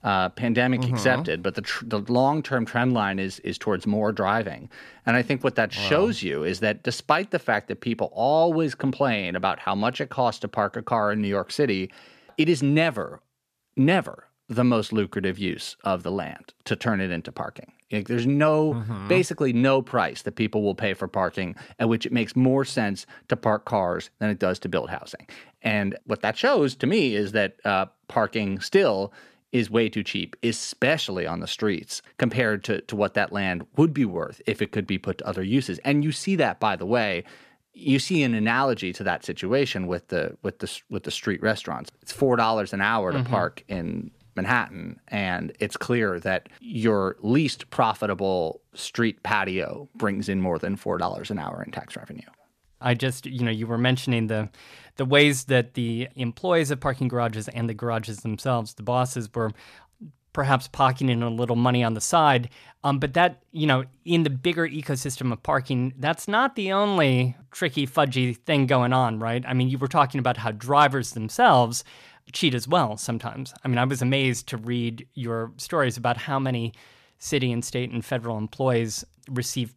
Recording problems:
none

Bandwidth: 14.5 kHz